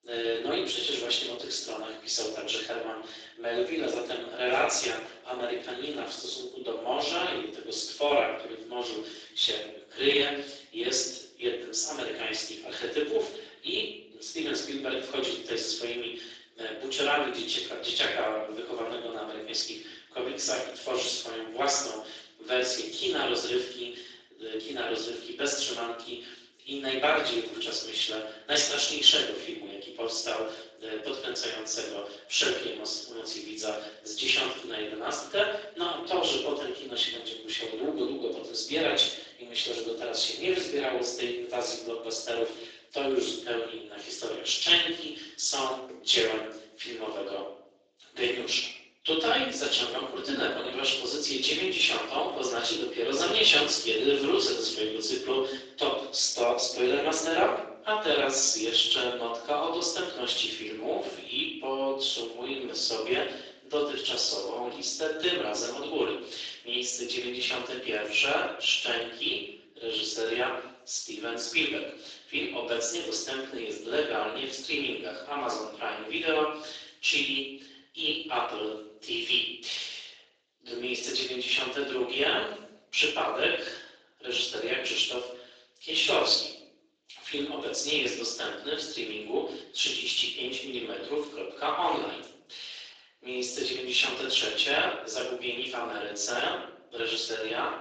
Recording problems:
off-mic speech; far
room echo; noticeable; dies away in 0.7 s
thin; somewhat; fading below 300 Hz
garbled, watery; slightly; nothing above 7.5 kHz

